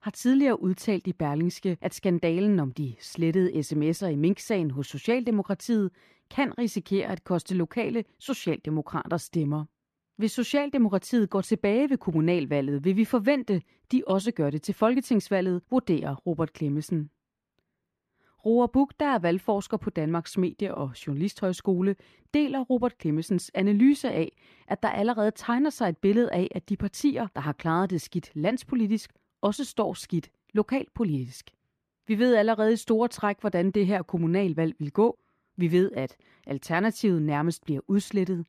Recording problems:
muffled; very; fading above 4 kHz

